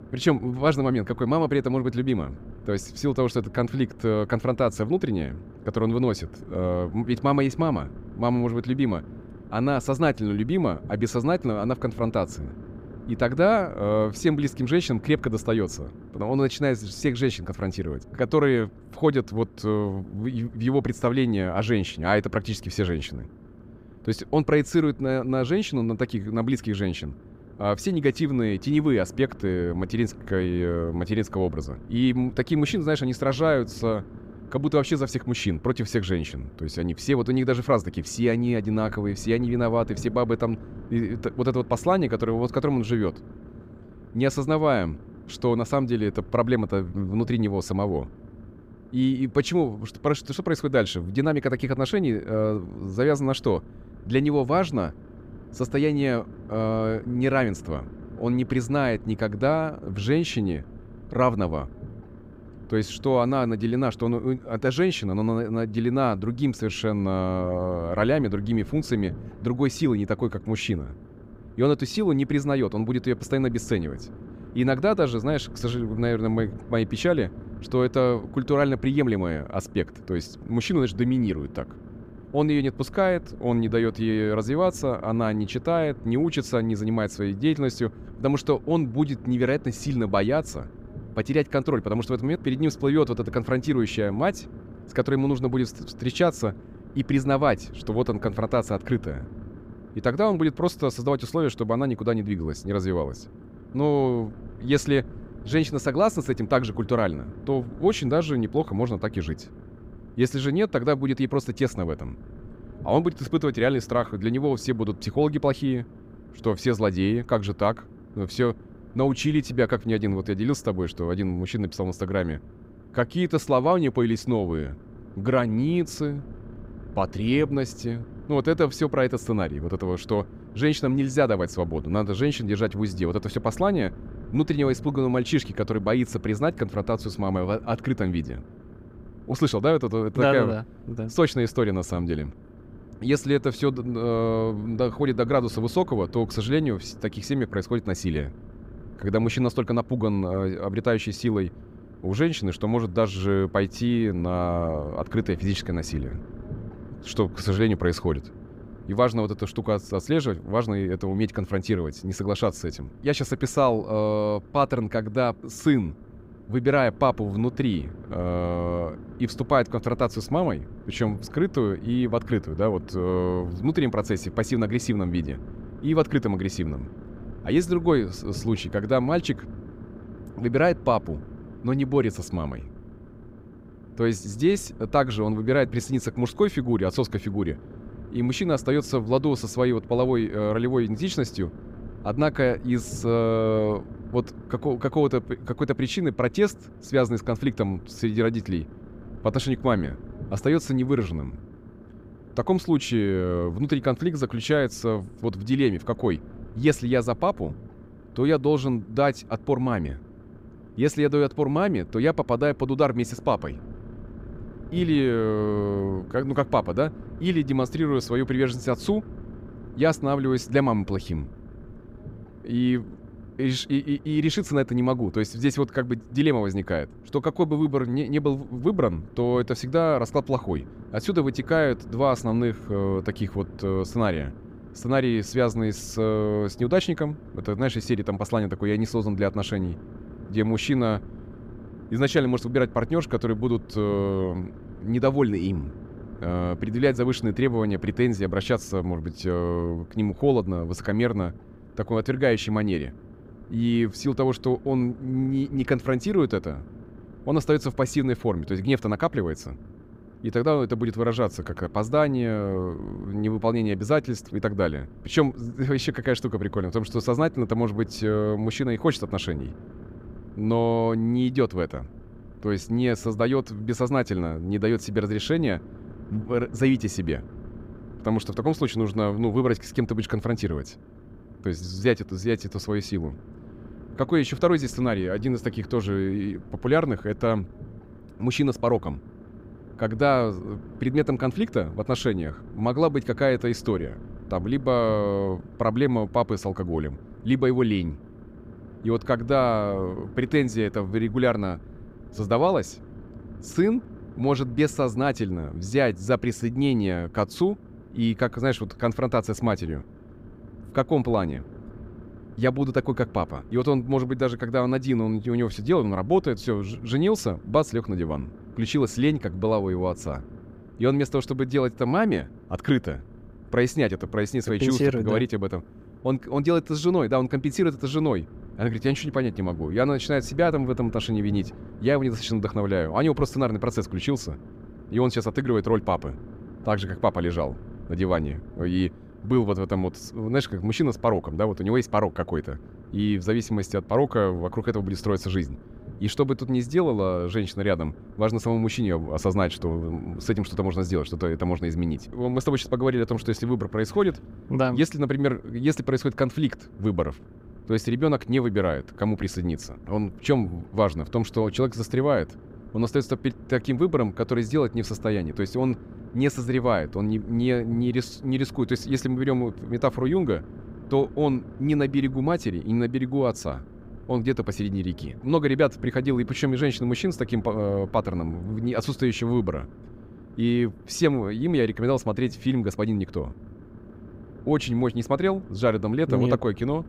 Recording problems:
low rumble; faint; throughout; 20 dB below the speech

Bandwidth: 15.5 kHz